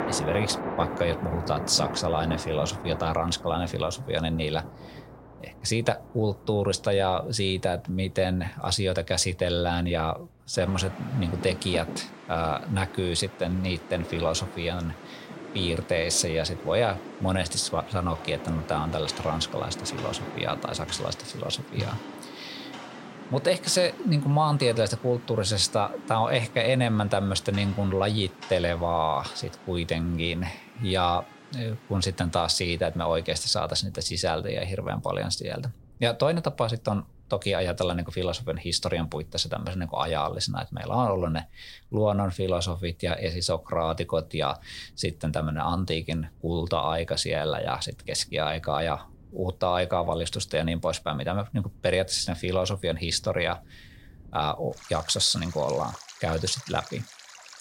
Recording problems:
rain or running water; noticeable; throughout; 15 dB below the speech

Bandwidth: 16 kHz